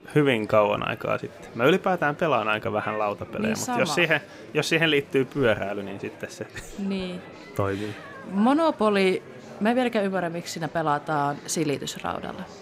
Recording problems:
murmuring crowd; noticeable; throughout; 20 dB below the speech

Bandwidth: 15.5 kHz